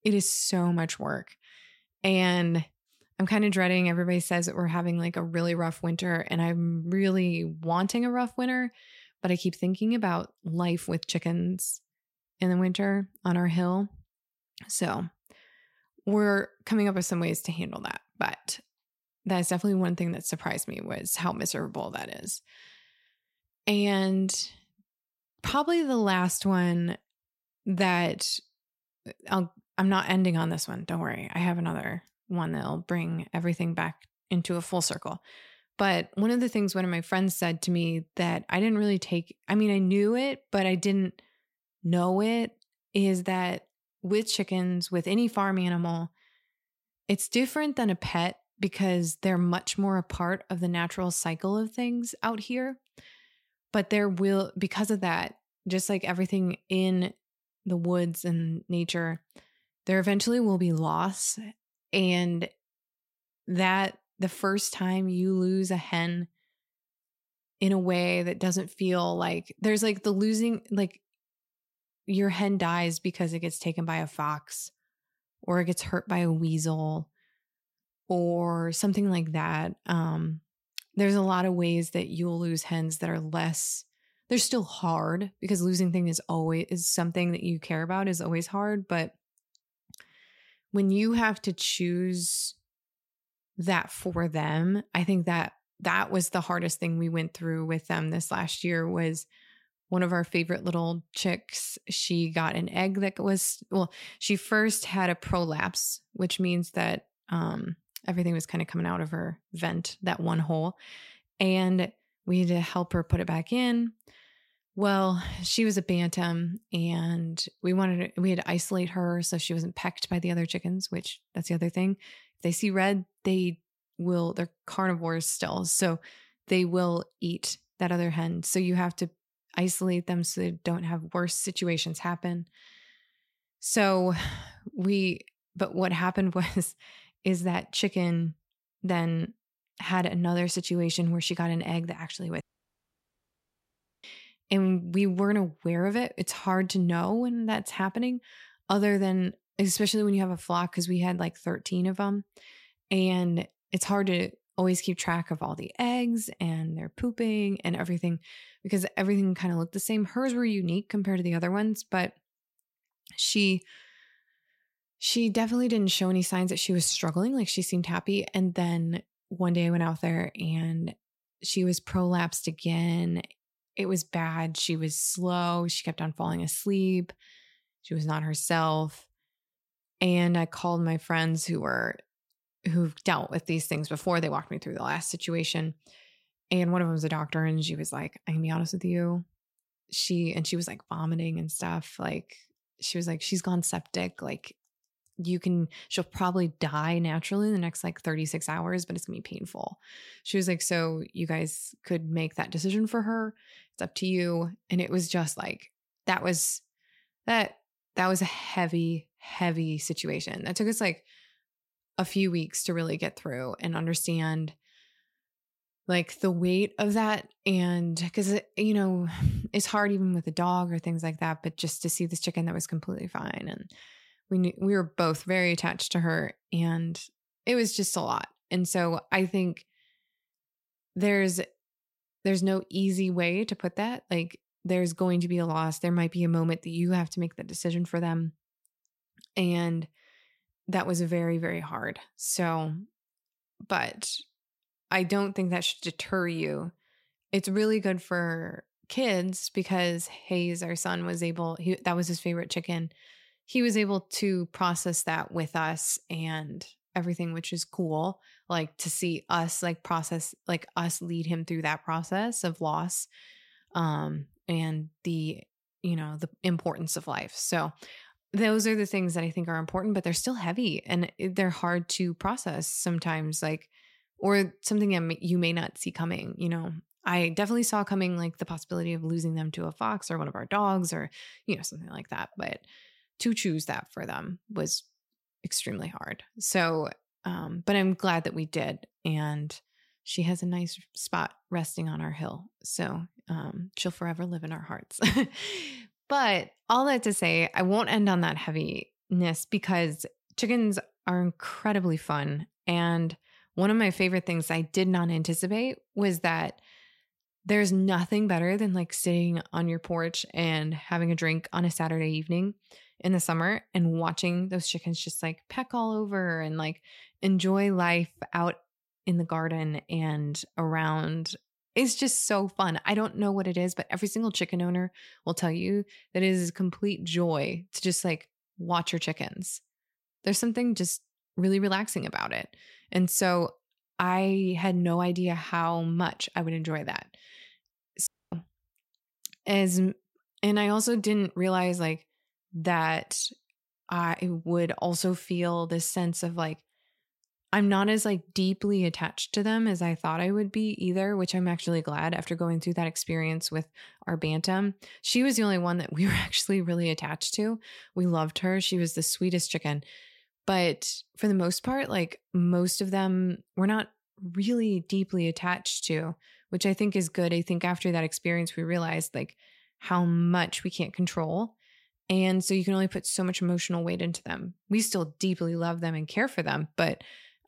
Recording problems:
audio cutting out; at 2:22 for 1.5 s and at 5:38

